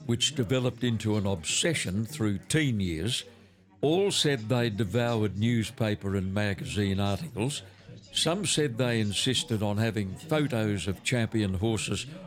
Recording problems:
chatter from many people; noticeable; throughout; 20 dB below the speech

